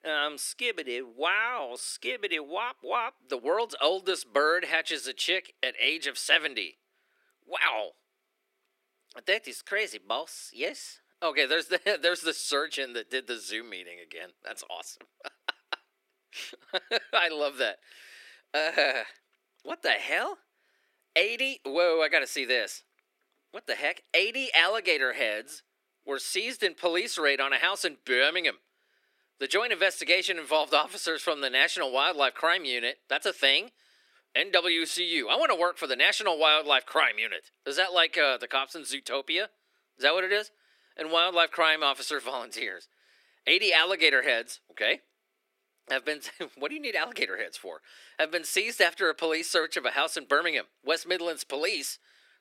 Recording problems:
thin; very; fading below 300 Hz

